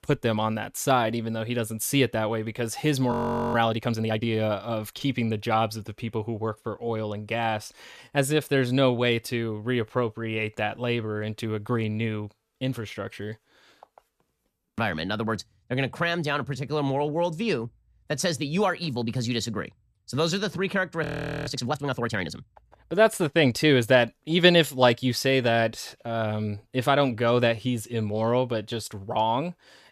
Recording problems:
audio freezing; at 3 s and at 21 s

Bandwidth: 14.5 kHz